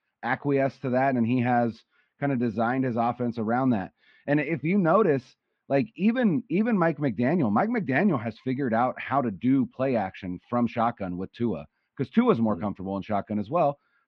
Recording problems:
muffled; very; fading above 3 kHz

